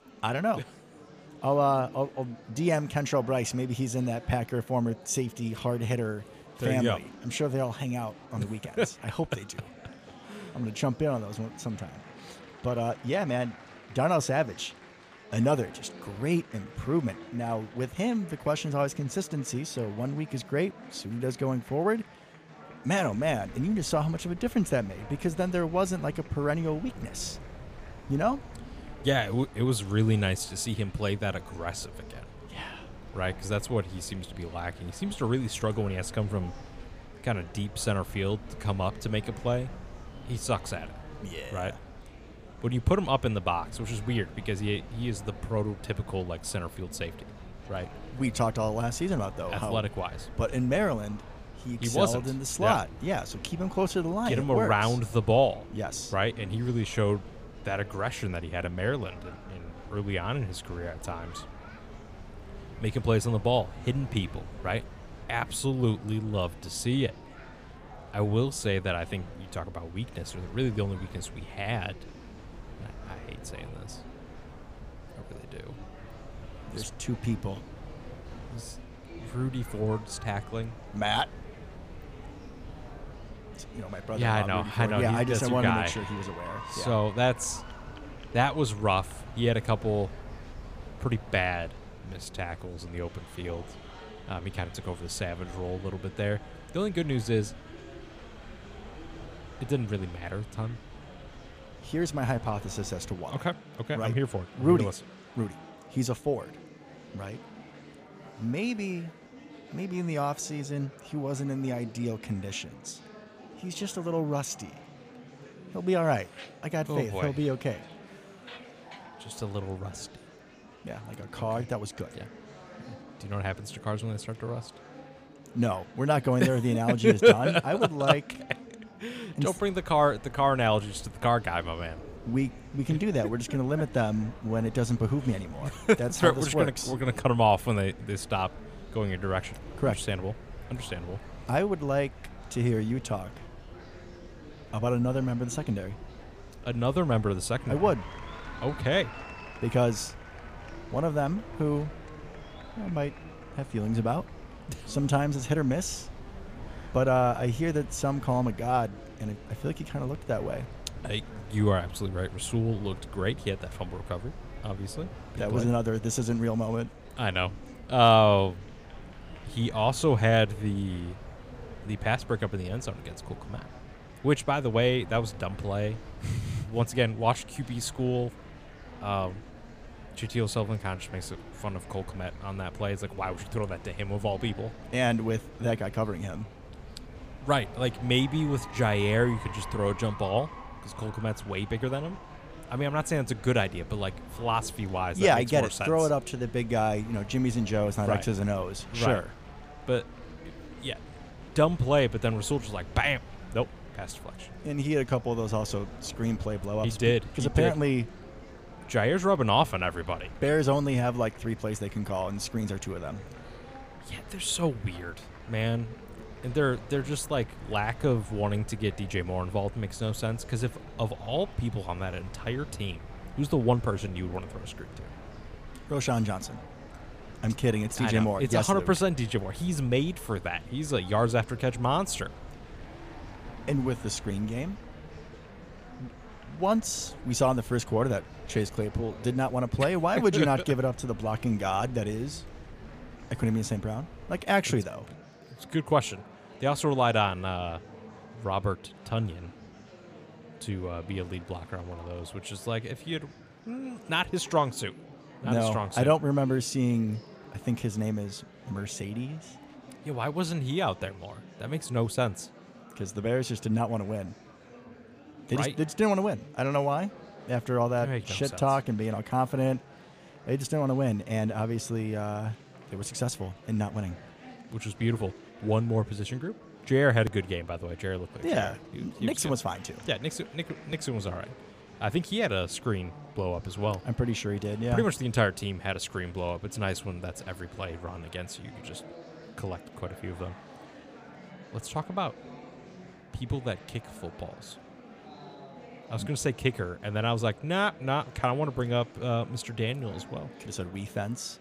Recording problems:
murmuring crowd; noticeable; throughout; 20 dB below the speech
wind noise on the microphone; occasional gusts; from 23 s to 1:43 and from 2:10 to 4:04; 25 dB below the speech

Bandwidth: 15 kHz